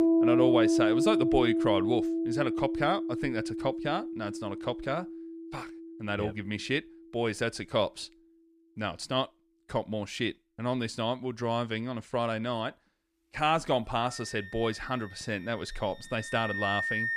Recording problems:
background music; very loud; throughout; 2 dB above the speech

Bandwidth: 14.5 kHz